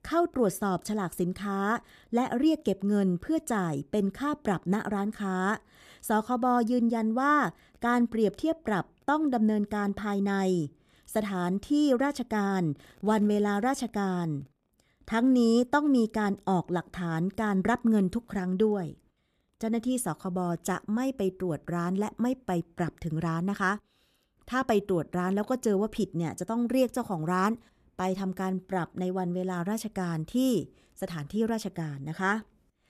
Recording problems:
none

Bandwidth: 14.5 kHz